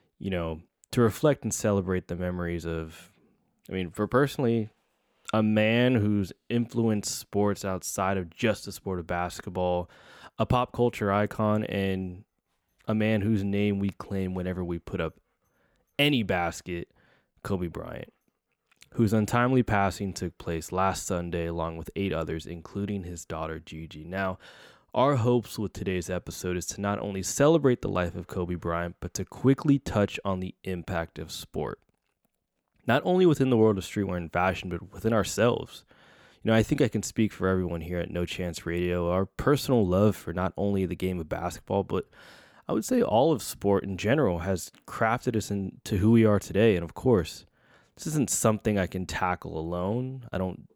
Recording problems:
none

